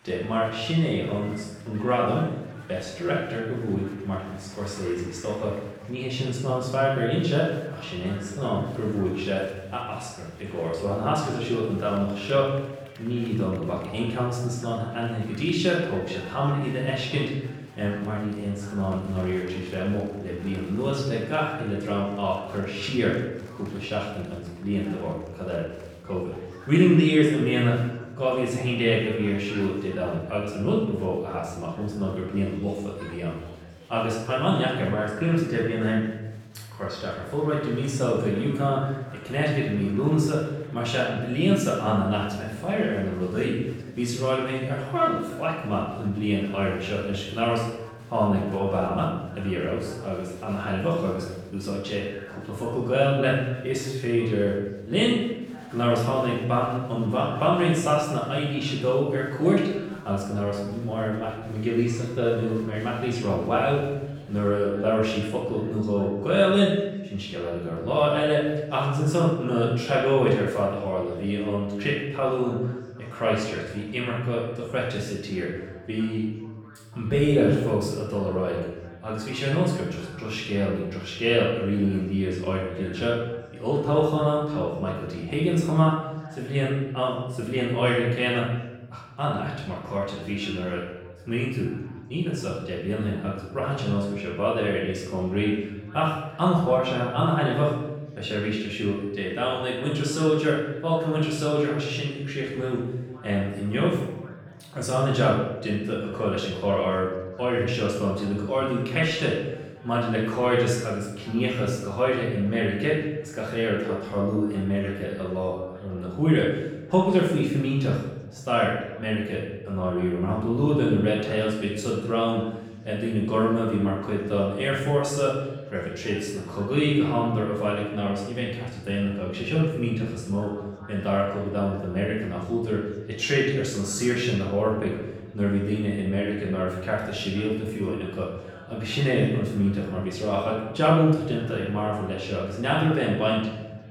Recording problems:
off-mic speech; far
room echo; noticeable; dies away in 0.9 s
chatter from many people; faint; throughout; 25 dB below the speech

